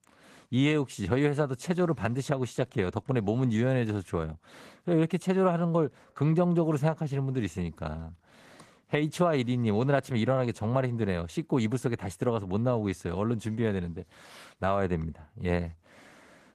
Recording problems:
garbled, watery; slightly; nothing above 14.5 kHz

